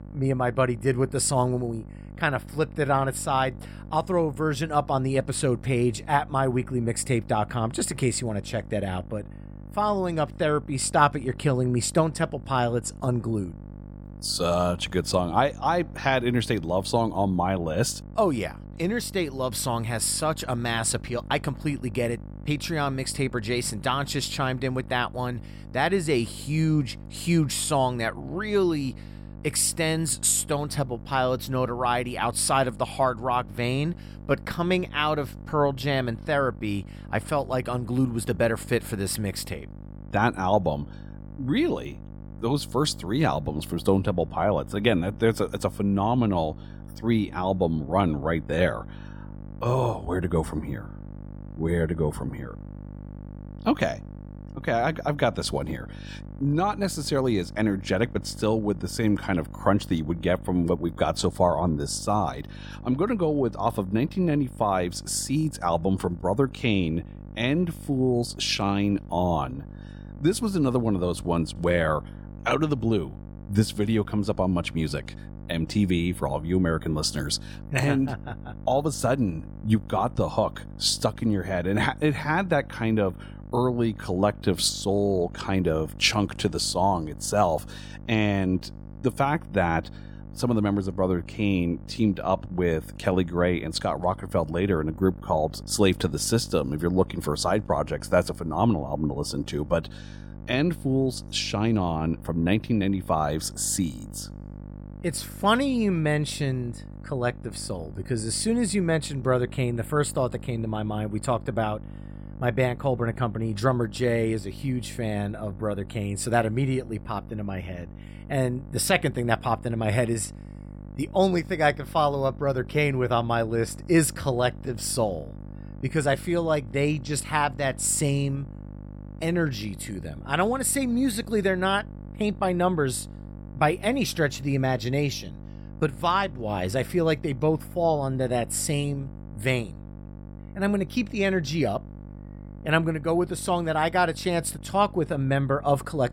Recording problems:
electrical hum; faint; throughout; 50 Hz, 25 dB below the speech

